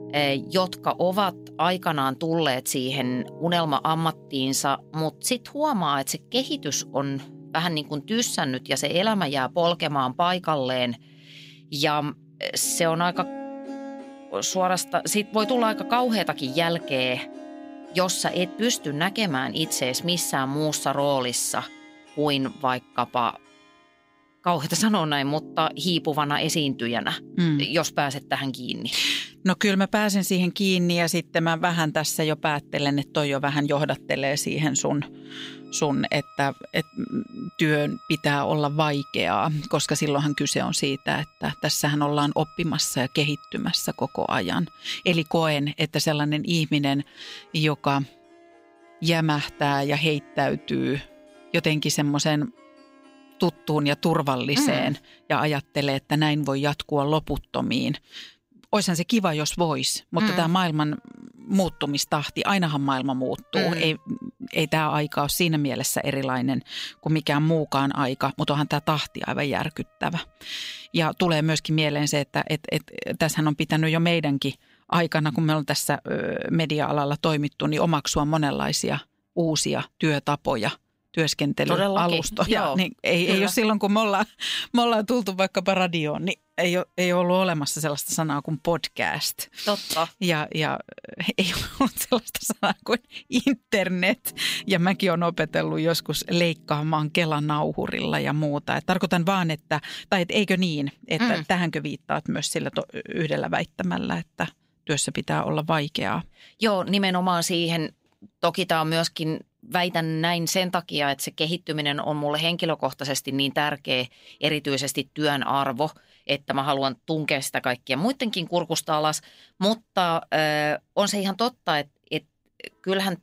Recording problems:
background music; faint; throughout; 20 dB below the speech

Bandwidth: 15.5 kHz